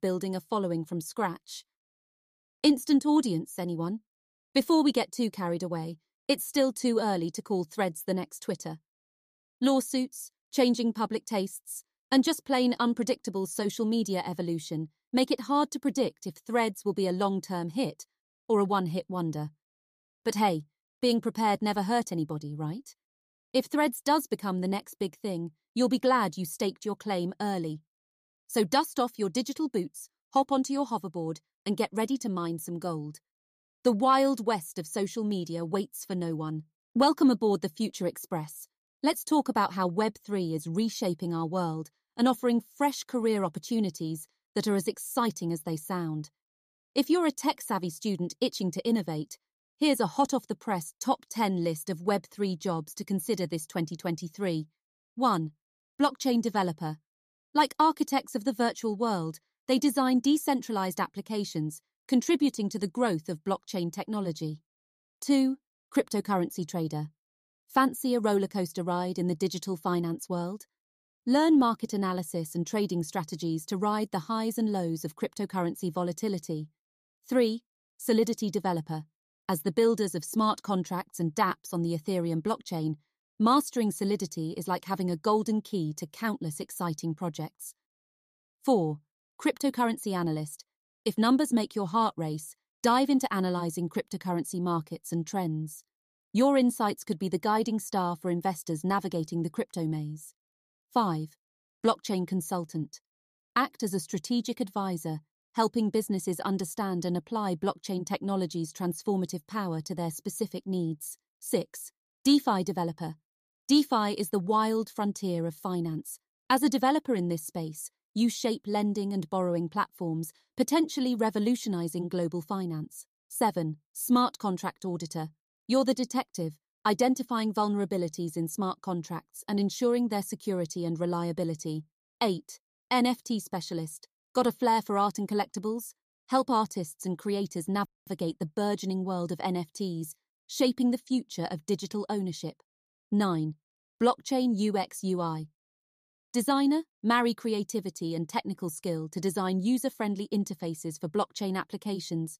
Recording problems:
none

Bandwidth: 14.5 kHz